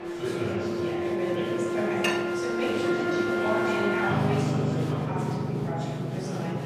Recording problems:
room echo; strong; dies away in 2.2 s
off-mic speech; far
background music; very loud; throughout; 3 dB above the speech
chatter from many people; loud; throughout; 3 dB below the speech
clattering dishes; loud; at 2 s; peak 2 dB above the speech

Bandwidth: 15 kHz